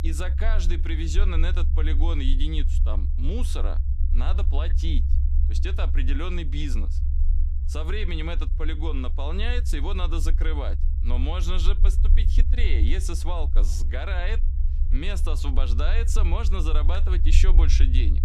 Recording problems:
low rumble; noticeable; throughout; 10 dB below the speech

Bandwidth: 14.5 kHz